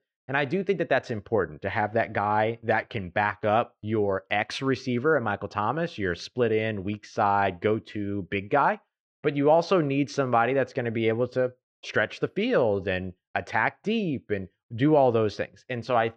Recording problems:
muffled; slightly; fading above 2.5 kHz

